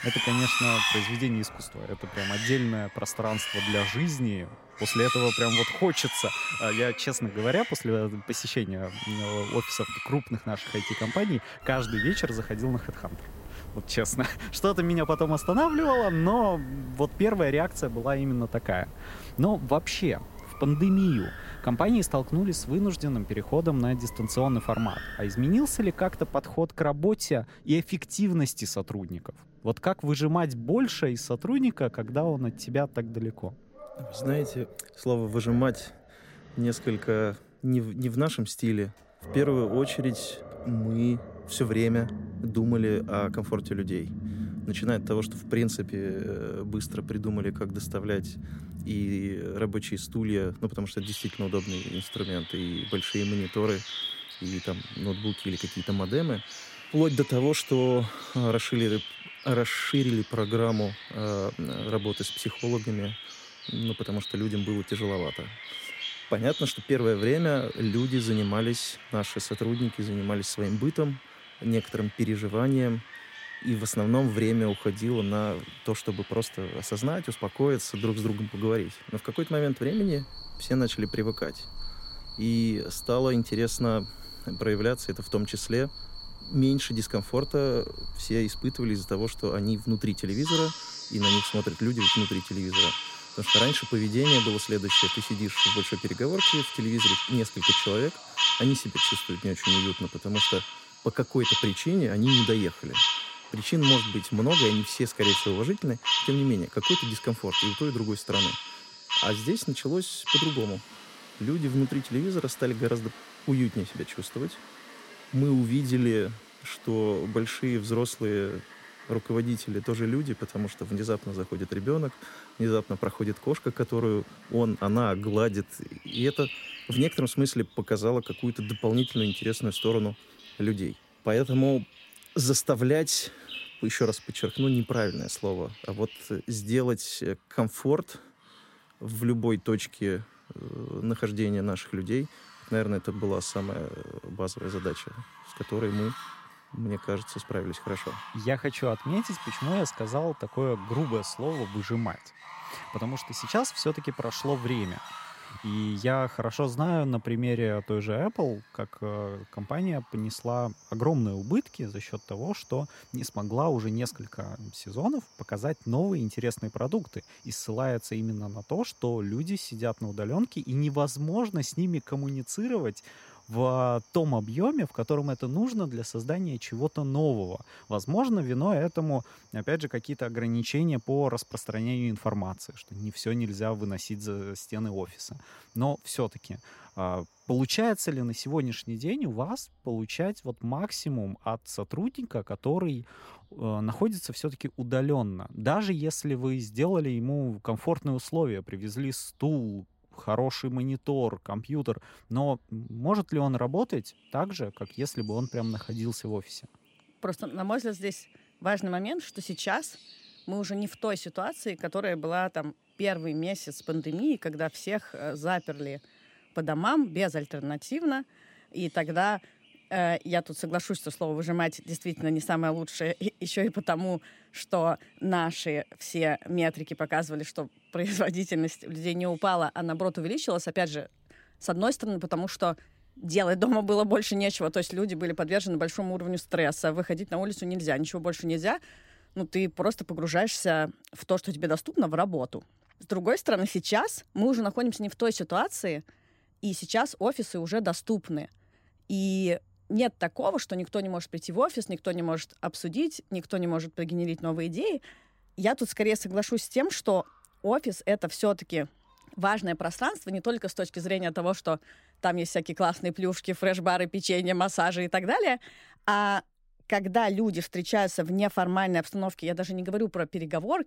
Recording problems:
animal sounds; loud; throughout; 3 dB below the speech

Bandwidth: 16 kHz